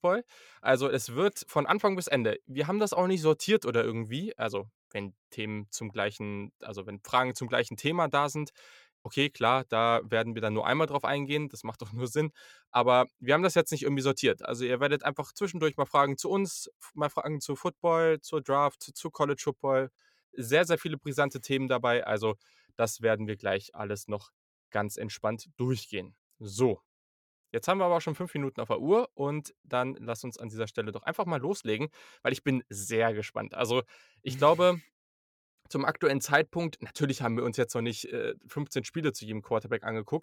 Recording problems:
none

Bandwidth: 17 kHz